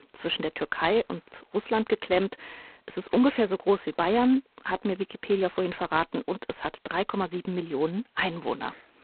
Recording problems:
phone-call audio; poor line; nothing above 4 kHz

